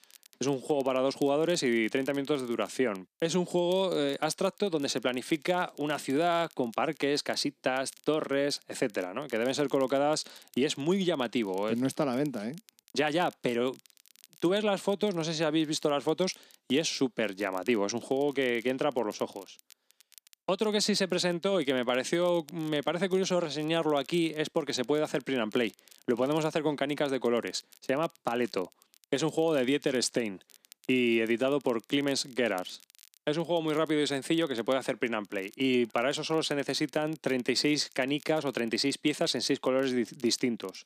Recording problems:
crackle, like an old record; faint; 25 dB below the speech

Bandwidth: 14.5 kHz